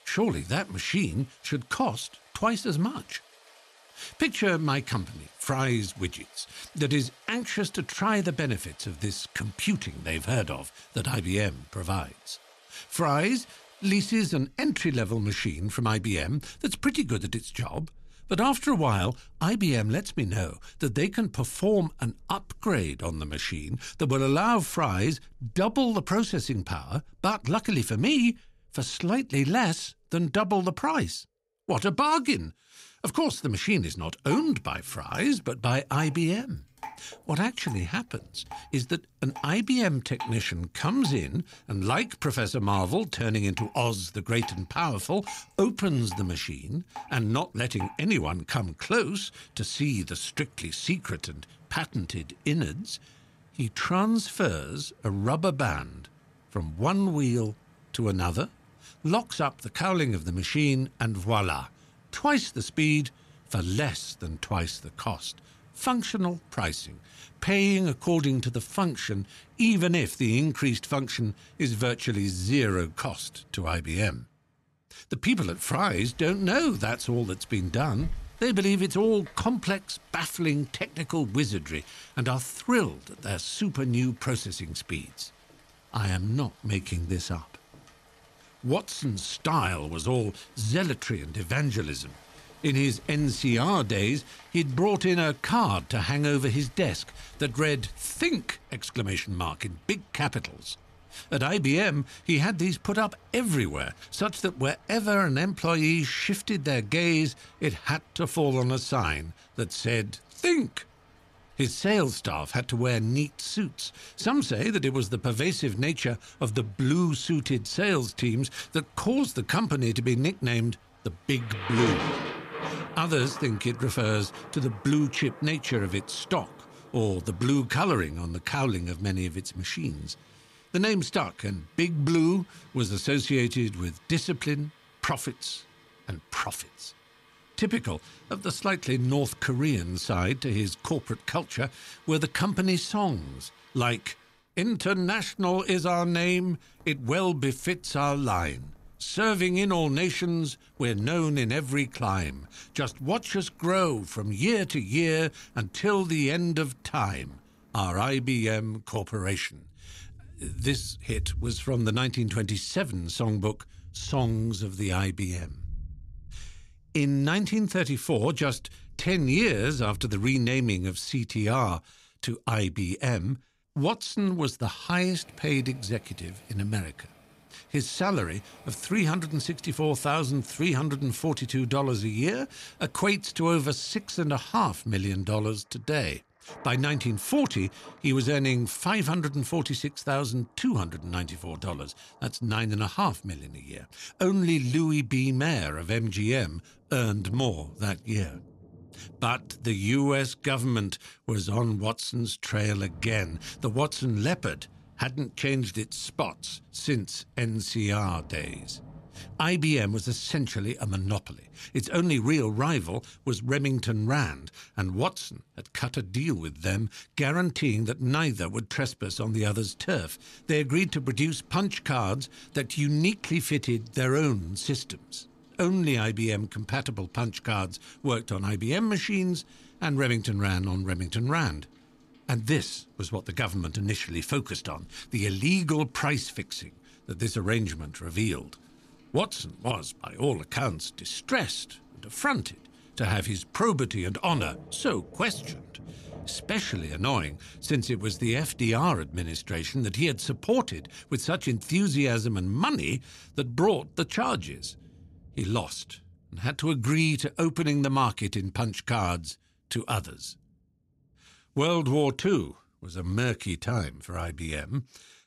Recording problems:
rain or running water; faint; throughout; 20 dB below the speech

